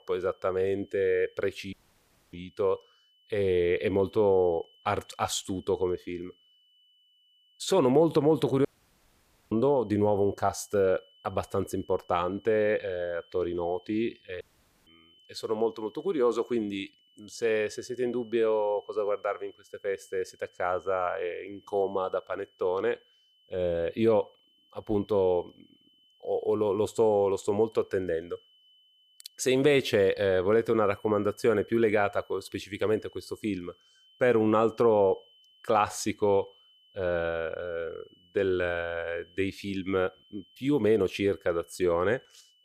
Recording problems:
high-pitched whine; faint; throughout; 3 kHz, 30 dB below the speech
audio cutting out; at 1.5 s for 0.5 s, at 8.5 s for 1 s and at 14 s

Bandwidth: 15 kHz